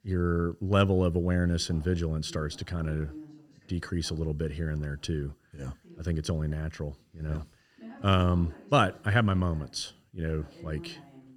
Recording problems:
voice in the background; faint; throughout; 20 dB below the speech

